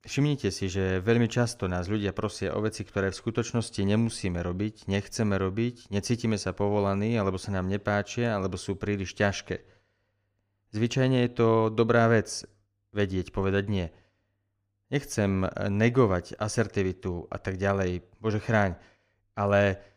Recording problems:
none

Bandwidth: 15 kHz